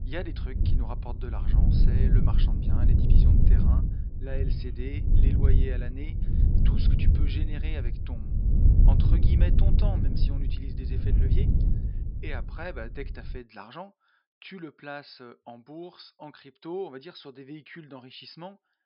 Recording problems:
high frequencies cut off; noticeable; nothing above 5.5 kHz
wind noise on the microphone; heavy; until 13 s; 1 dB above the speech

